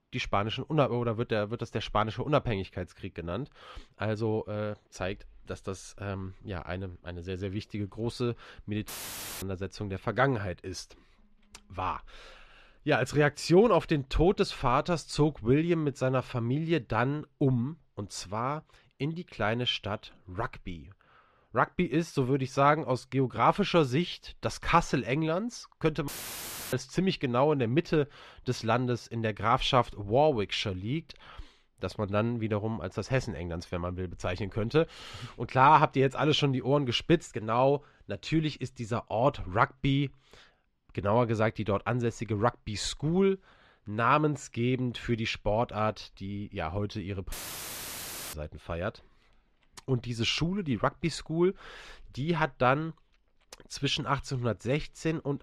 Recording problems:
muffled; slightly; fading above 3.5 kHz
audio cutting out; filled with static; at 9 s for 0.5 s, at 26 s for 0.5 s and at 47 s for 1 s

